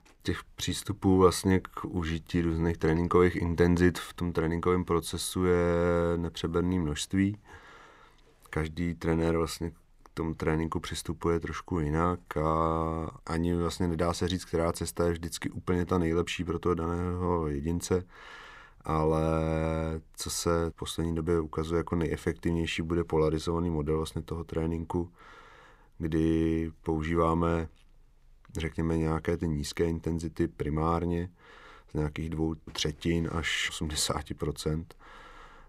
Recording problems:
none

